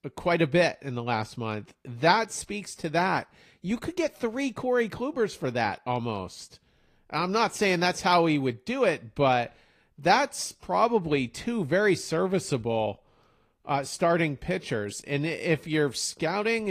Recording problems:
garbled, watery; slightly; nothing above 15 kHz
abrupt cut into speech; at the end

